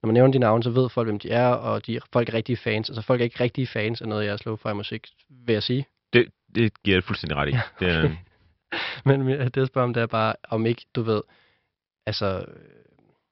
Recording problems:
high frequencies cut off; noticeable; nothing above 5.5 kHz

